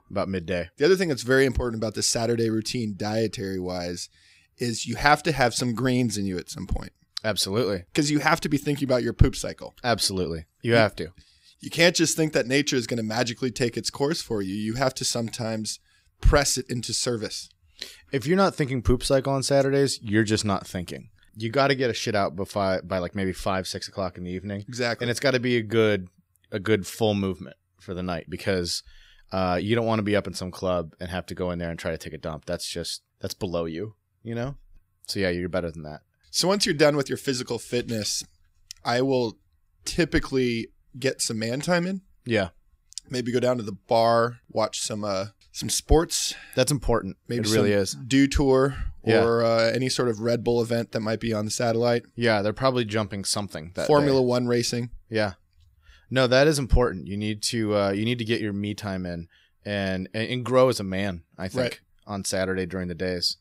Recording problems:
none

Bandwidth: 15.5 kHz